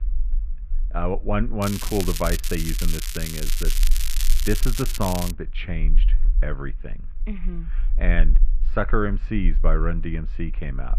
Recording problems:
muffled; very; fading above 2.5 kHz
crackling; loud; from 1.5 to 5.5 s; 3 dB below the speech
low rumble; faint; throughout; 25 dB below the speech

